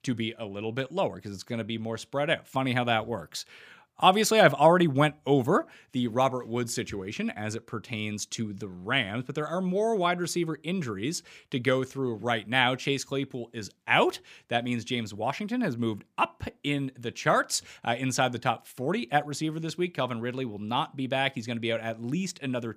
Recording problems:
none

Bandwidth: 15 kHz